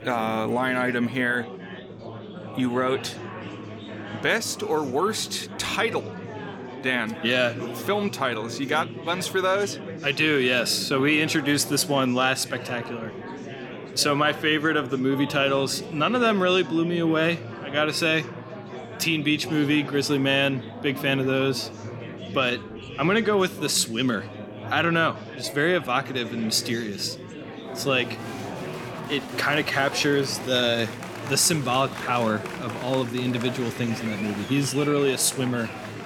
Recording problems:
chatter from many people; noticeable; throughout; 10 dB below the speech

